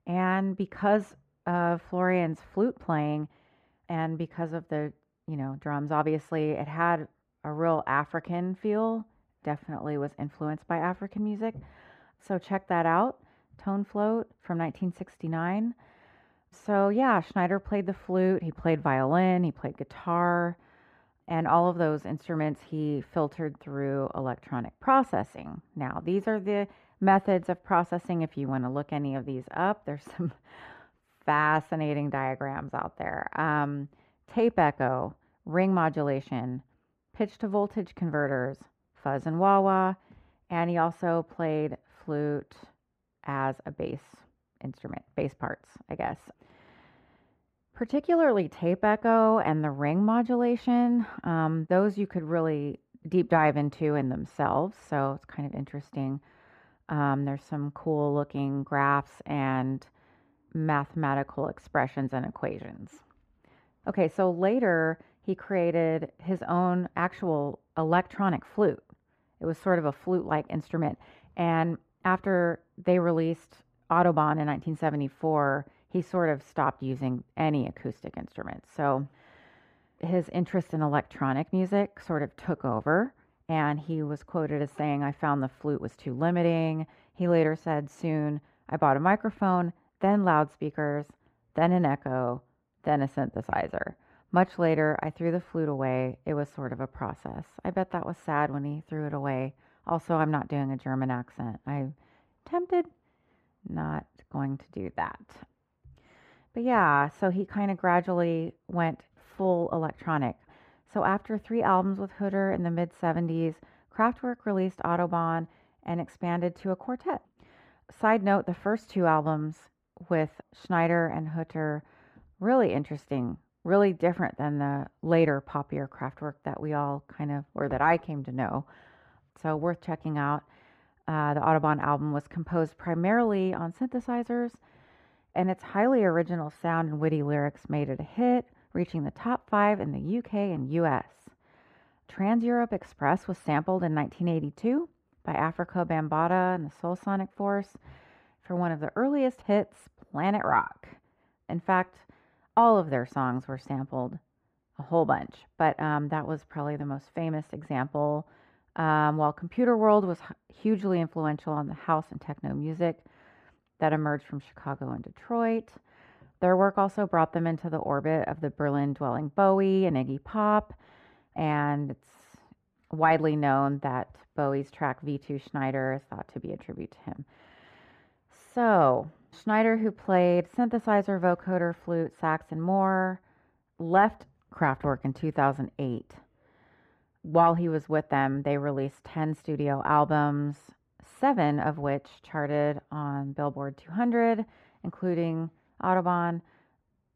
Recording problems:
muffled; very; fading above 3.5 kHz

